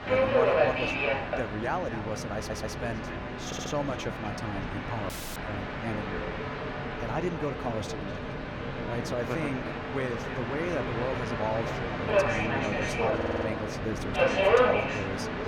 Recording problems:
echo of what is said; noticeable; throughout; 250 ms later, 15 dB below the speech
train or aircraft noise; very loud; throughout; 5 dB above the speech
audio stuttering; at 2.5 s, at 3.5 s and at 13 s
audio cutting out; at 5 s

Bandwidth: 18 kHz